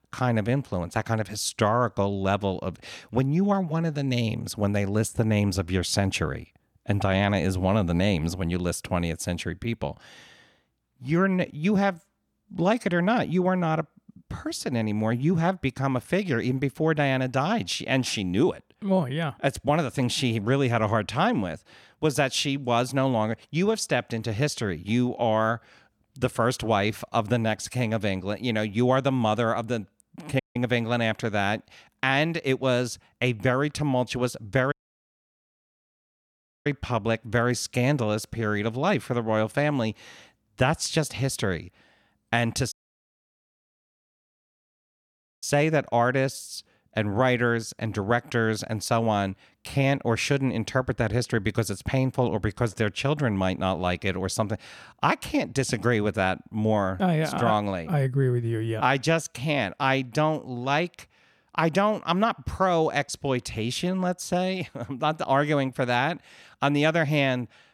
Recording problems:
audio cutting out; at 30 s, at 35 s for 2 s and at 43 s for 2.5 s

